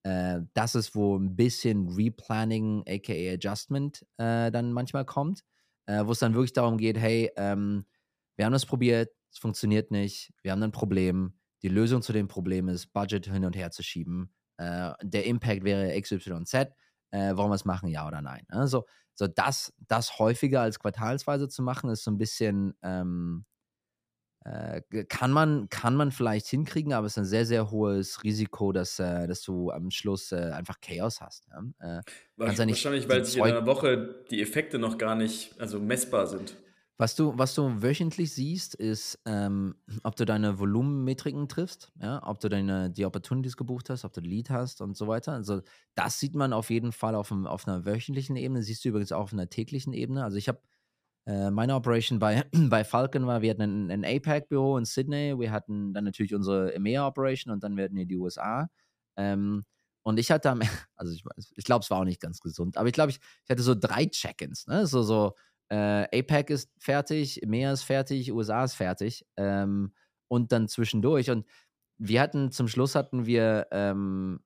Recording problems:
none

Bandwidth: 15 kHz